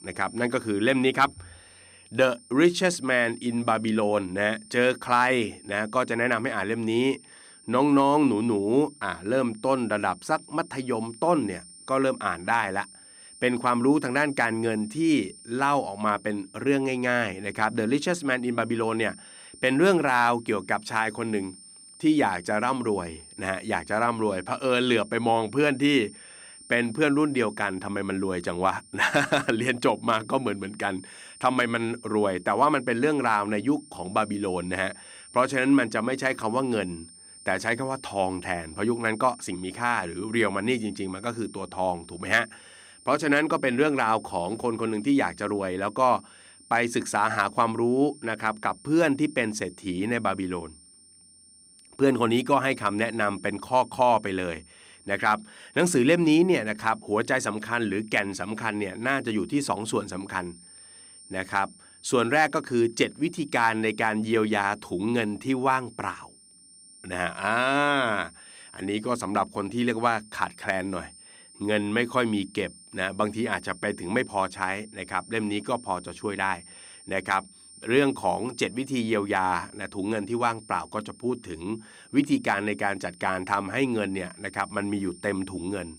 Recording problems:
high-pitched whine; faint; throughout; 9 kHz, 20 dB below the speech

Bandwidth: 15.5 kHz